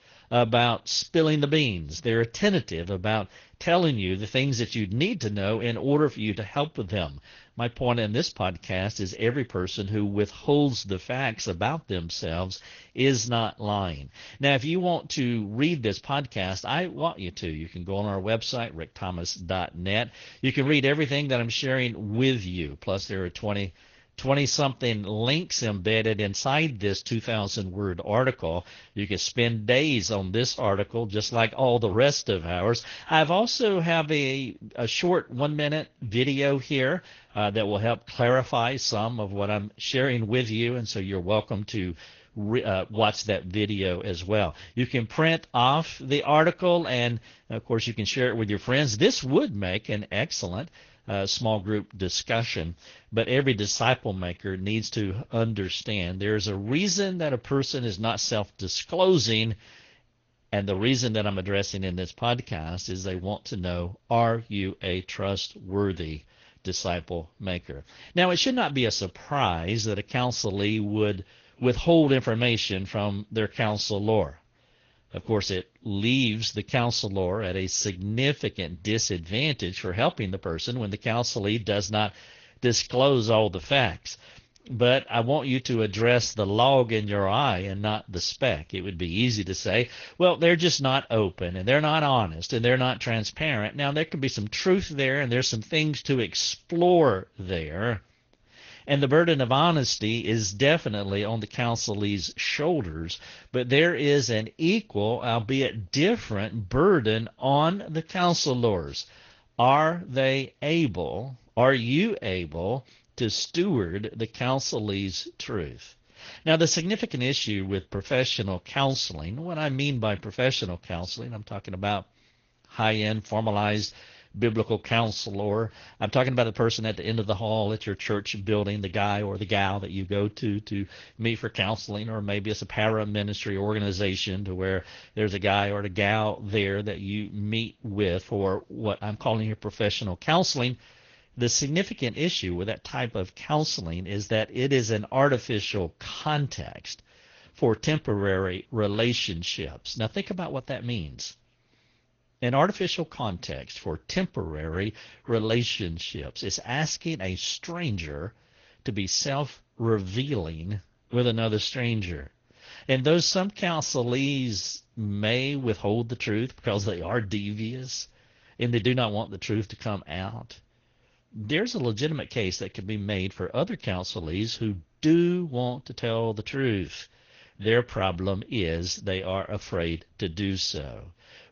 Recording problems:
garbled, watery; slightly; nothing above 6.5 kHz

